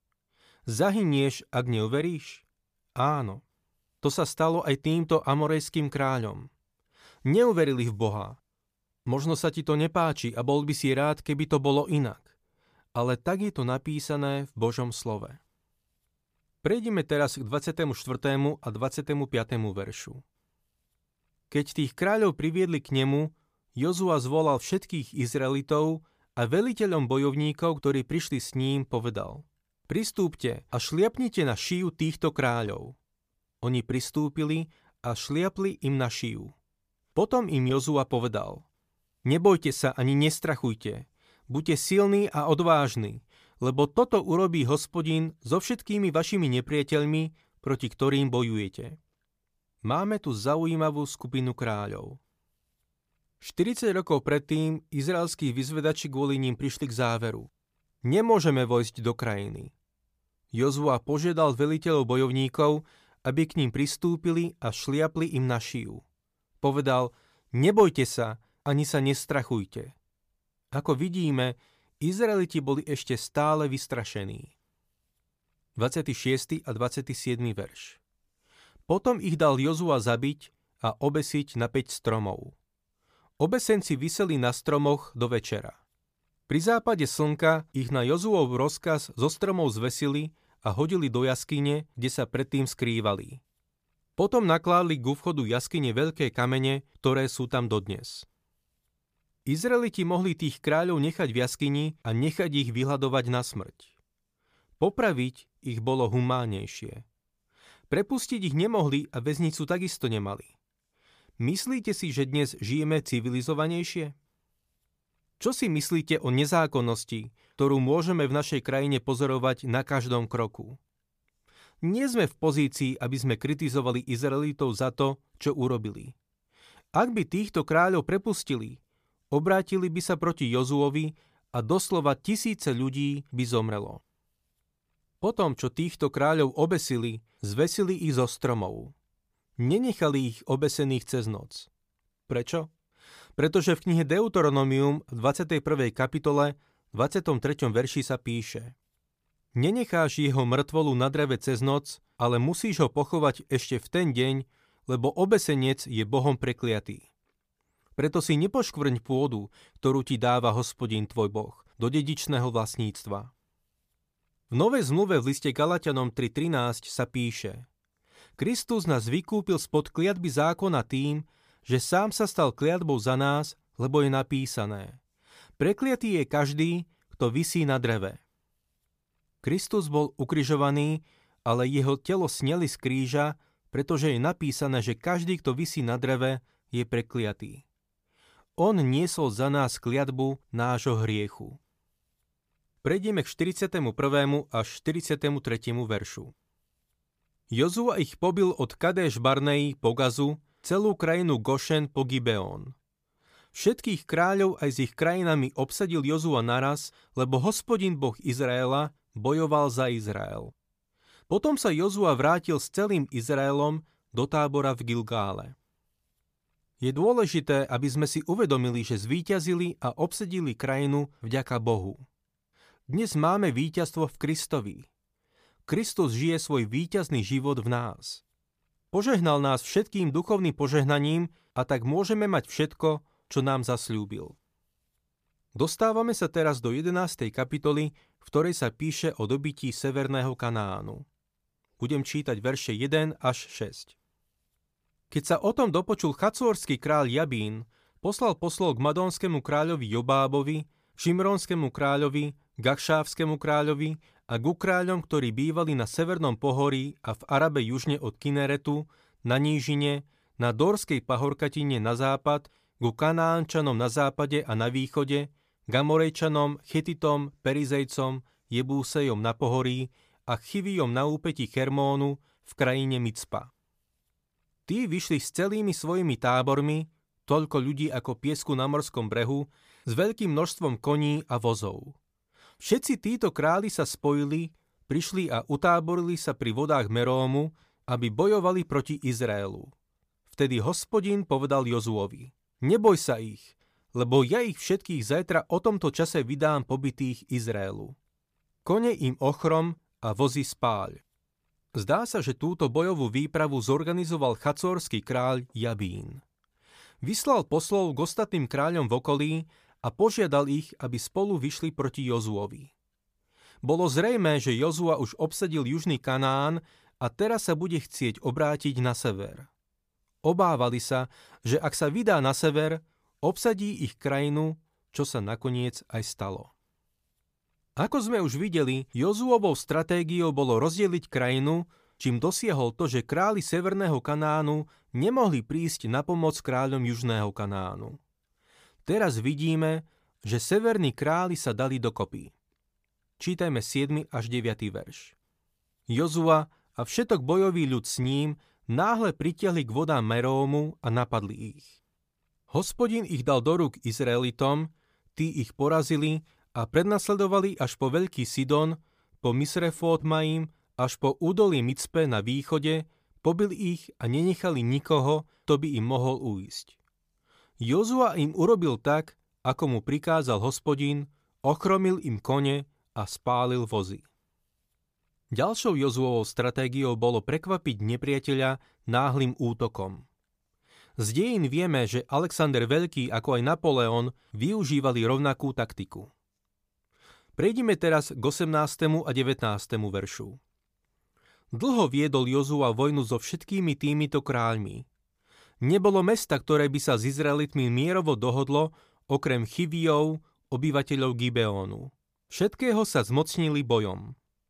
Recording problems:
none

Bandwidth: 15 kHz